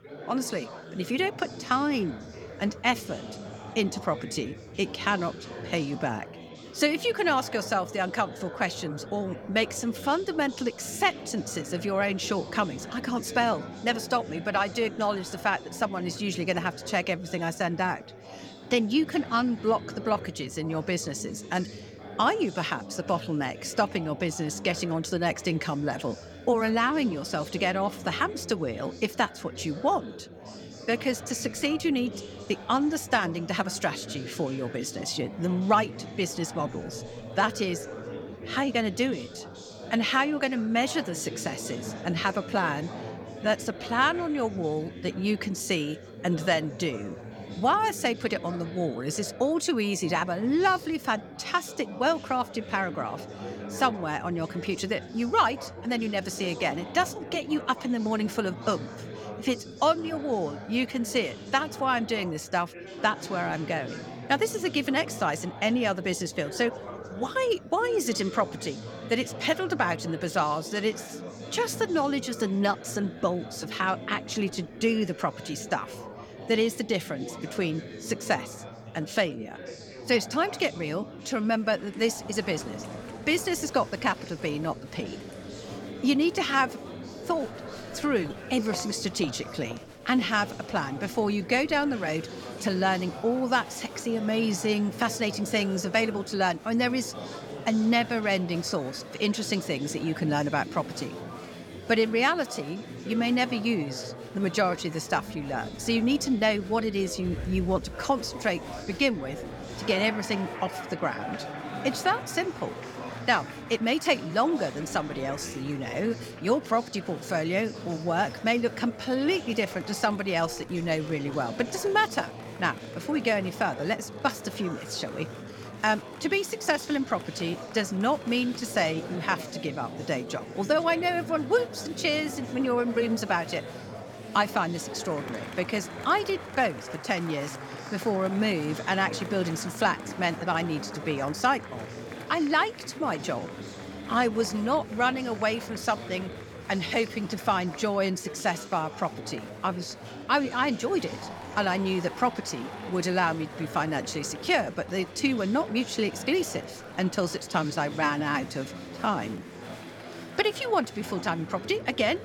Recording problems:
chatter from many people; noticeable; throughout; 10 dB below the speech

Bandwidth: 17.5 kHz